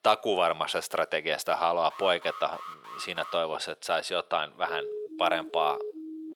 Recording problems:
thin; very; fading below 550 Hz
alarm; faint; from 2 to 3.5 s; peak 15 dB below the speech
siren; noticeable; from 4.5 s on; peak 7 dB below the speech

